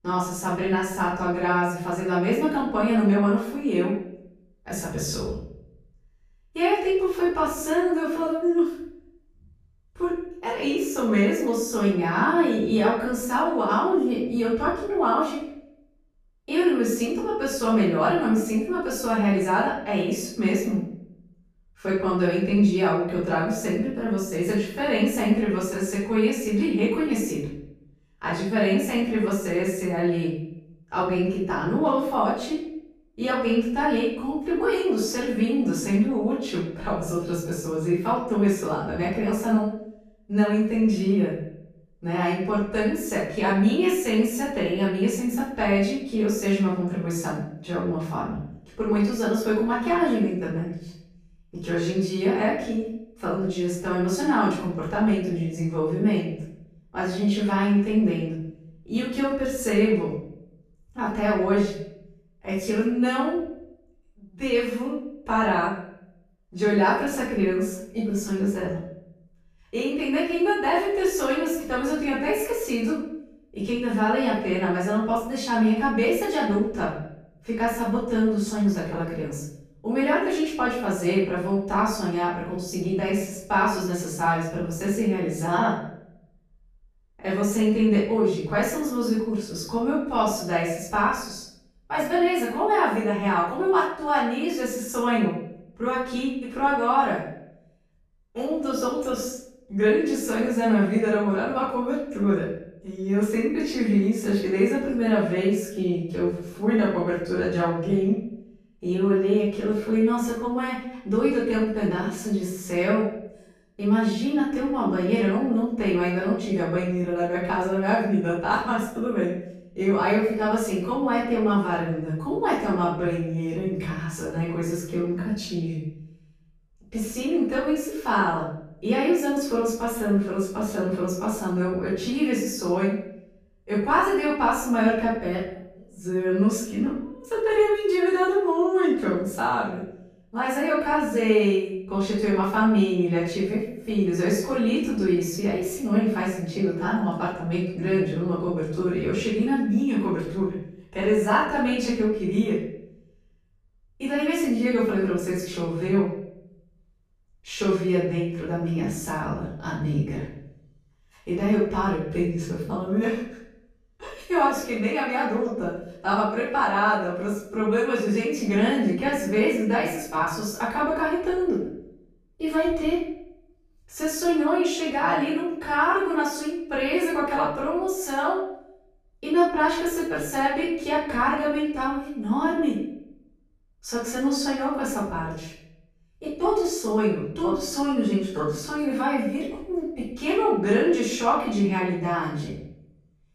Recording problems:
off-mic speech; far
room echo; noticeable; dies away in 0.6 s

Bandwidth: 14.5 kHz